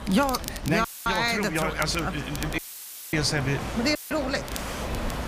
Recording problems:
chatter from many people; noticeable; throughout; 15 dB below the speech
wind noise on the microphone; occasional gusts; 10 dB below the speech
crackle, like an old record; noticeable; 15 dB below the speech
audio cutting out; filled with static; at 1 s, at 2.5 s for 0.5 s and at 4 s

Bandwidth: 15 kHz